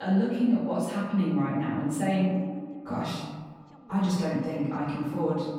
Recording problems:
off-mic speech; far
echo of what is said; noticeable; throughout; 130 ms later, 15 dB below the speech
room echo; noticeable; dies away in 1.2 s
voice in the background; faint; throughout; 30 dB below the speech
abrupt cut into speech; at the start

